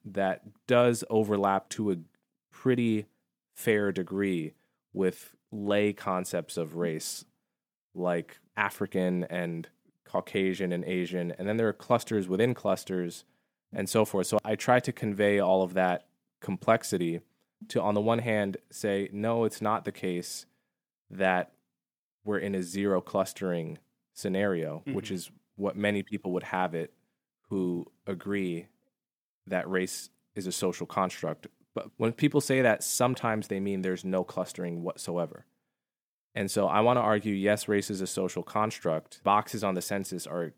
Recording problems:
none

